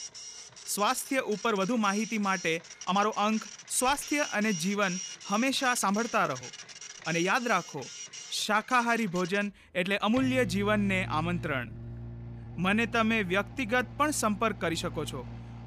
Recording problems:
household noises; noticeable; throughout; 15 dB below the speech
uneven, jittery; strongly; from 0.5 to 15 s

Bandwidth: 14.5 kHz